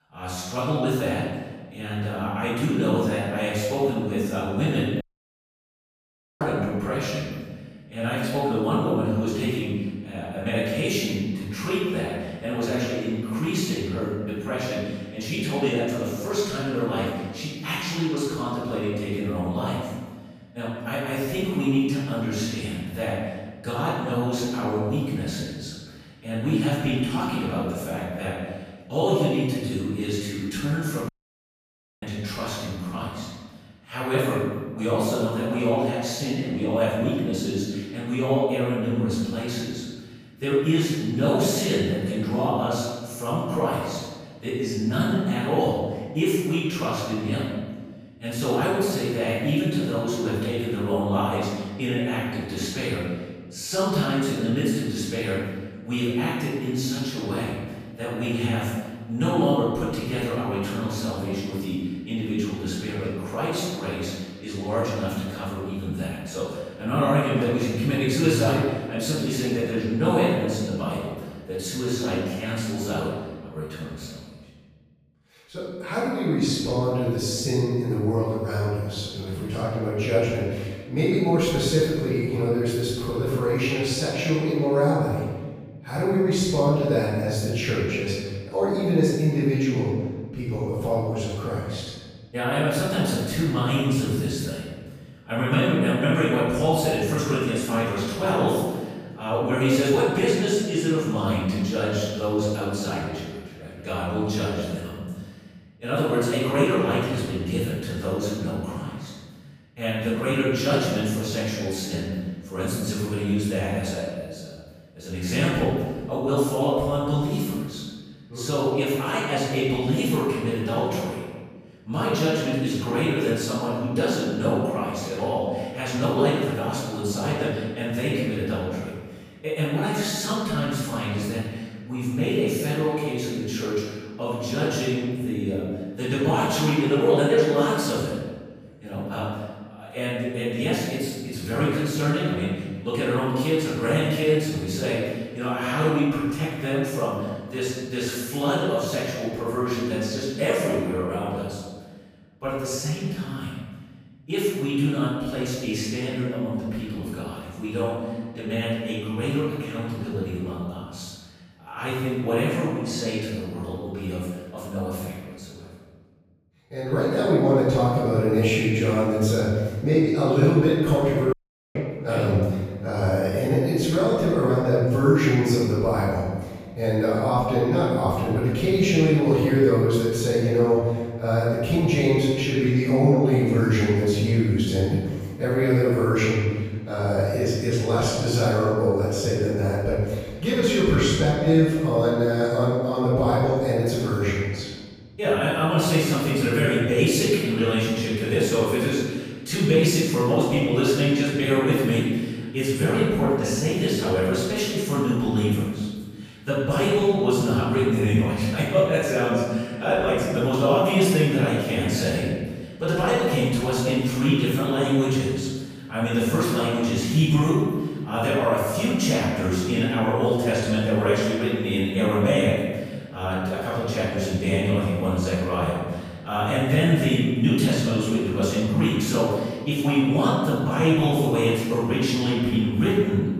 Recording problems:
room echo; strong; dies away in 1.4 s
off-mic speech; far
audio cutting out; at 5 s for 1.5 s, at 31 s for 1 s and at 2:51

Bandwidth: 15 kHz